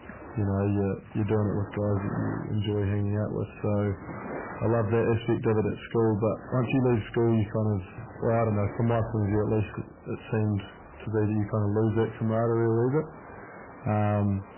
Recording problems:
garbled, watery; badly; nothing above 3 kHz
distortion; slight; 10 dB below the speech
rain or running water; noticeable; throughout; 15 dB below the speech

